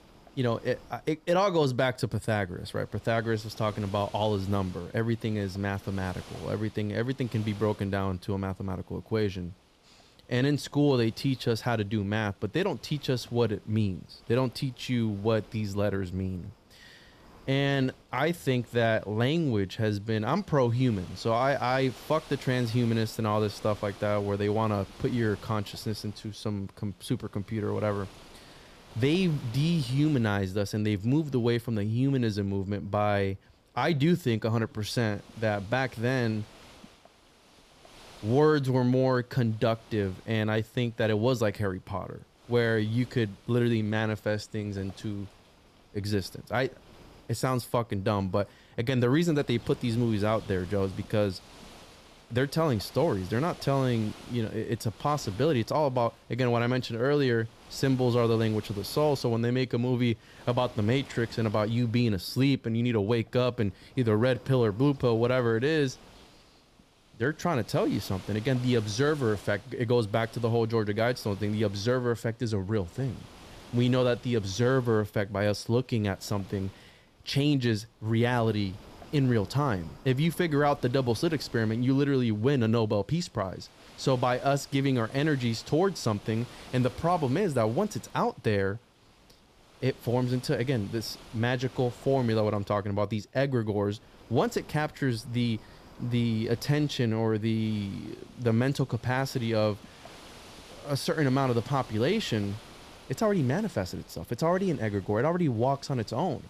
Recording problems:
wind noise on the microphone; occasional gusts; 20 dB below the speech

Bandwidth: 14.5 kHz